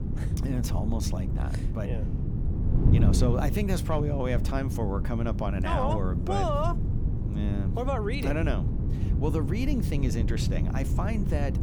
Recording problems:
wind noise on the microphone; heavy; 7 dB below the speech

